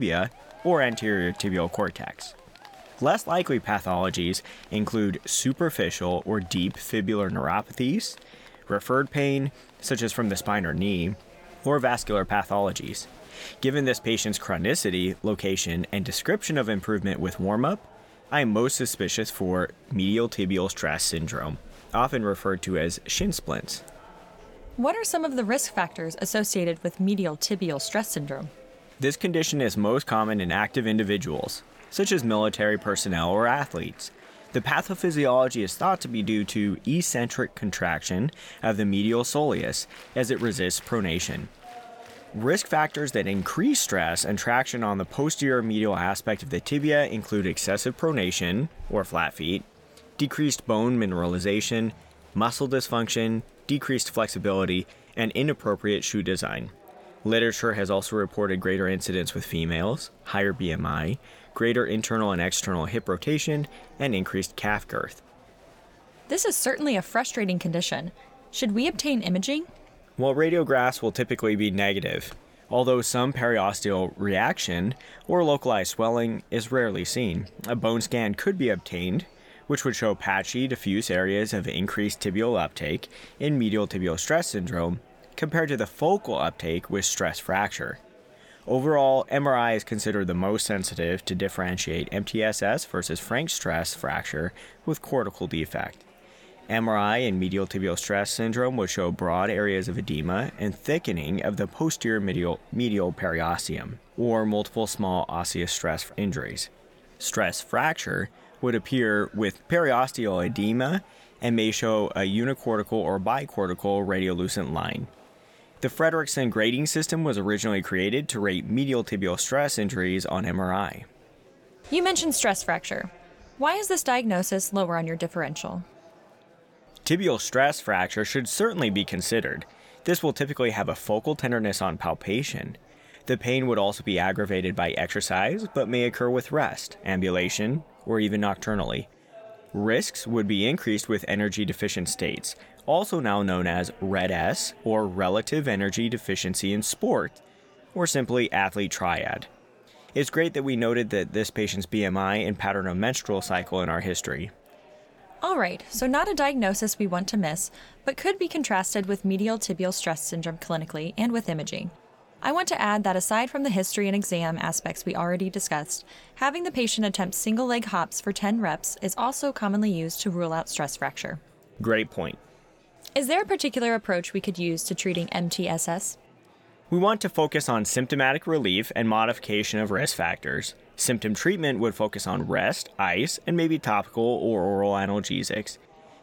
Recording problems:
murmuring crowd; faint; throughout; 25 dB below the speech
abrupt cut into speech; at the start

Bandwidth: 17.5 kHz